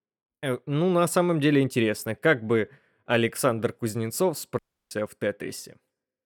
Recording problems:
audio cutting out; at 4.5 s

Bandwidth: 18.5 kHz